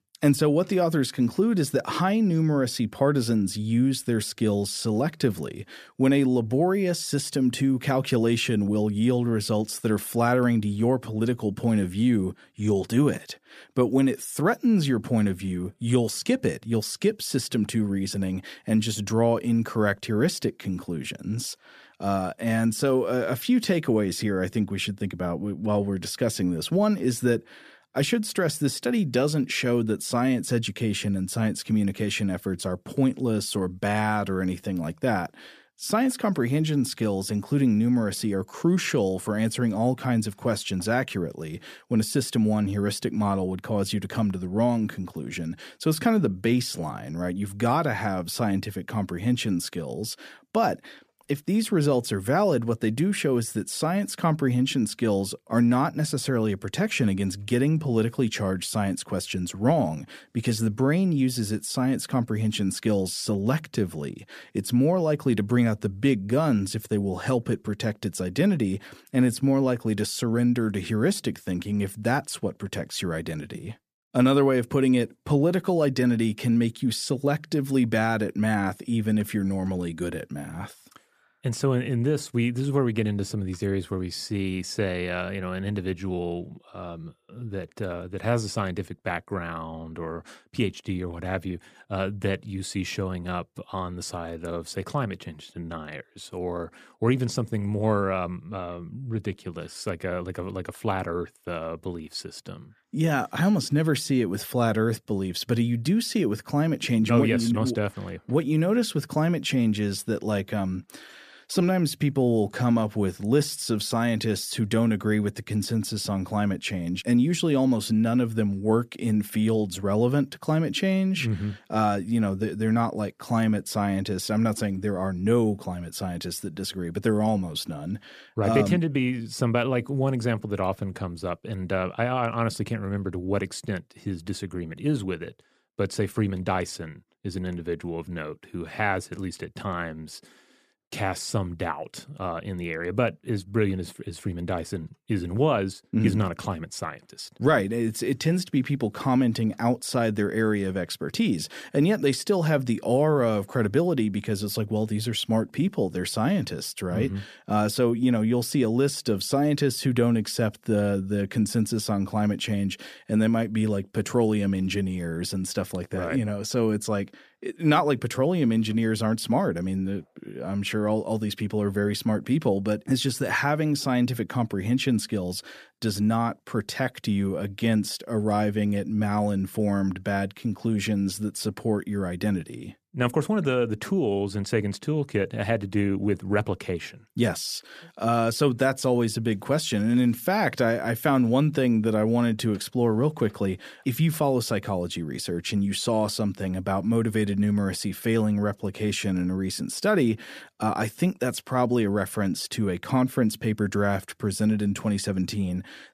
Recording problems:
none

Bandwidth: 14.5 kHz